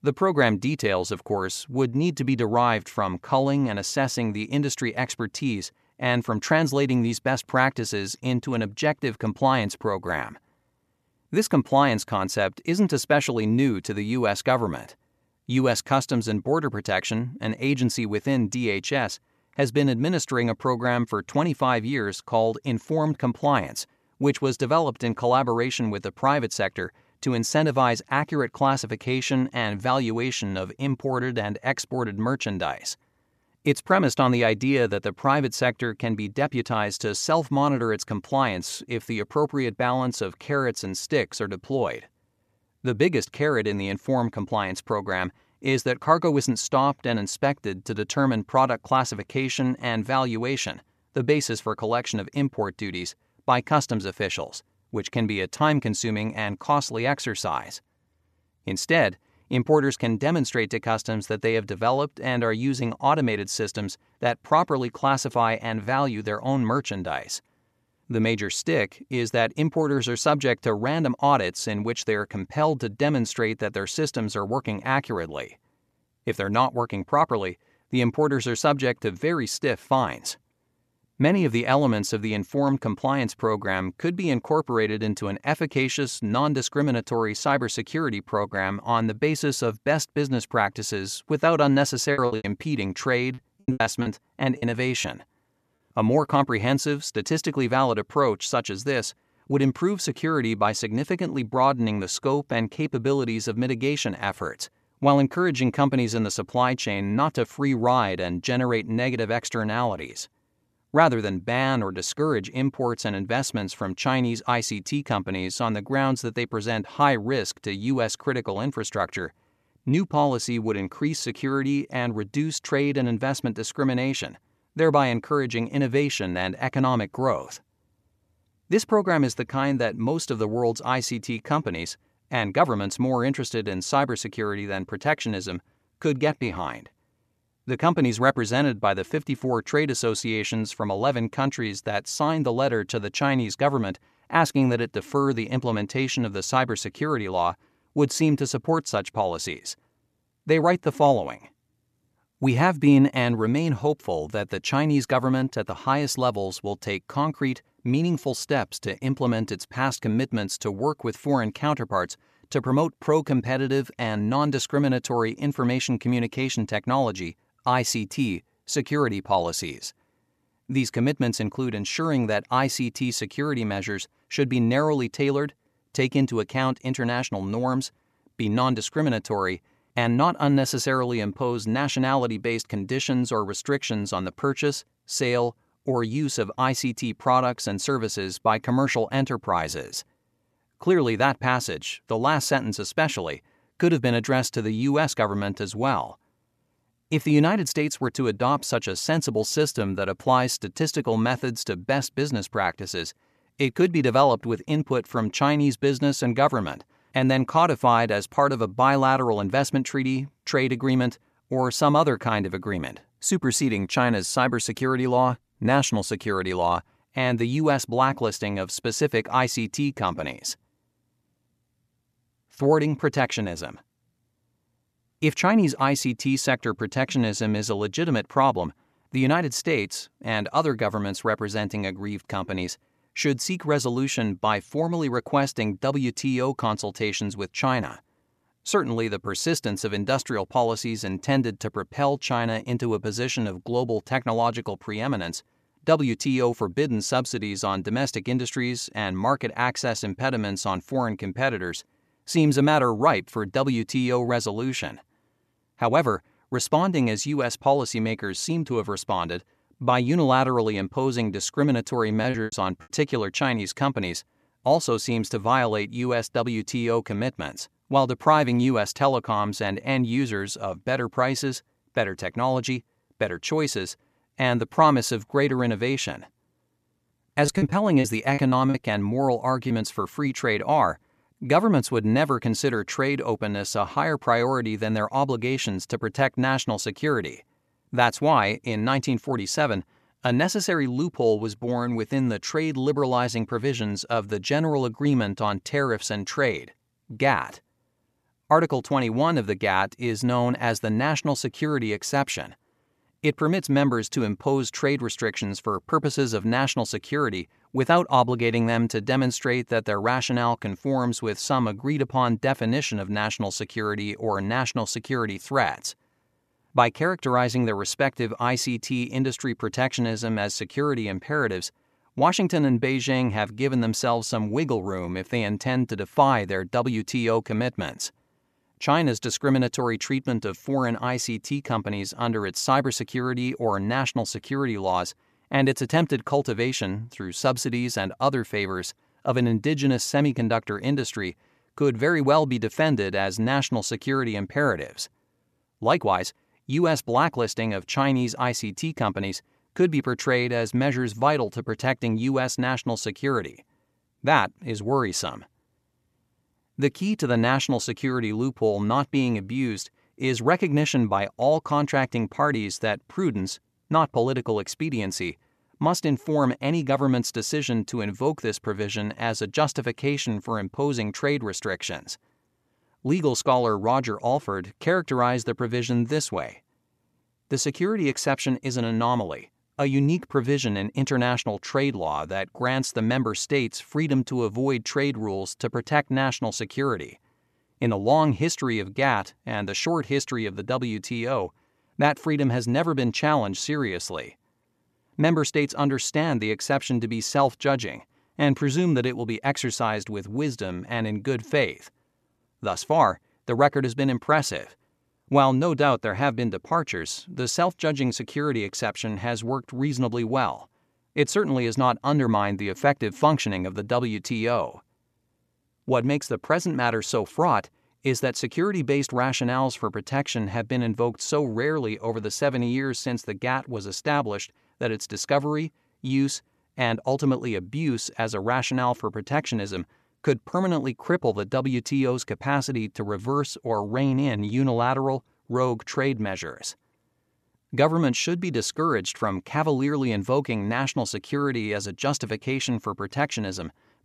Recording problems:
choppy; very; from 1:32 to 1:35, at 4:22 and from 4:37 to 4:40; 15% of the speech affected

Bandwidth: 14 kHz